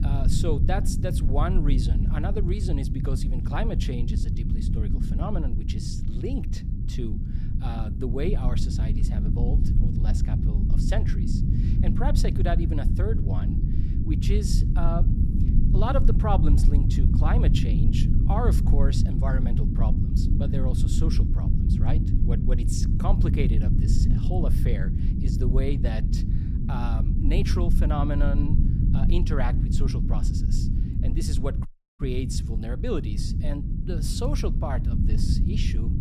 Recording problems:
low rumble; loud; throughout; 3 dB below the speech
audio cutting out; at 32 s

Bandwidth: 15 kHz